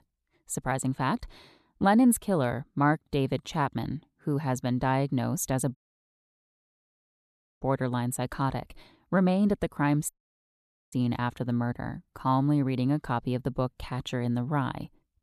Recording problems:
audio cutting out; at 6 s for 2 s and at 10 s for 1 s

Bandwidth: 13.5 kHz